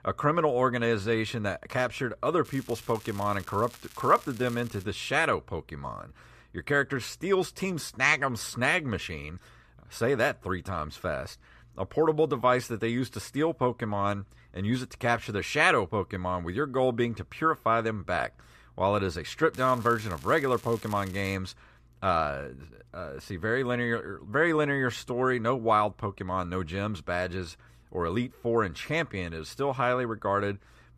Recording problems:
crackling; faint; from 2.5 to 5 s and from 20 to 21 s; 20 dB below the speech

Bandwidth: 14.5 kHz